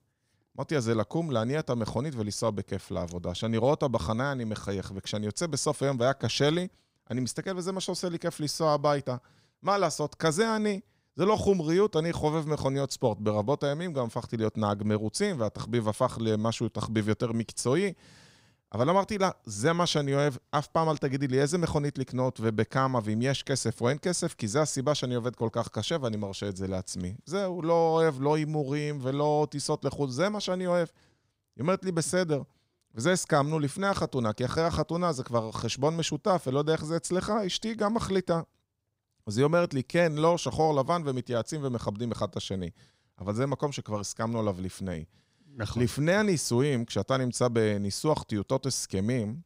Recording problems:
none

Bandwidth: 15.5 kHz